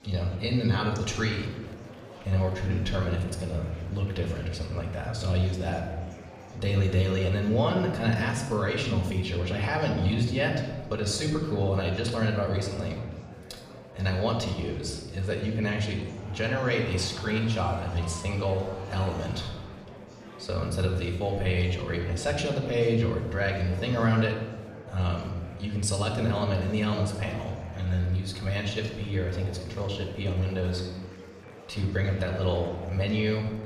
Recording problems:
off-mic speech; far
room echo; noticeable; dies away in 1 s
murmuring crowd; noticeable; throughout; 15 dB below the speech

